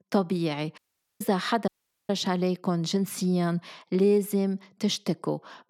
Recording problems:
audio cutting out; at 1 s and at 1.5 s

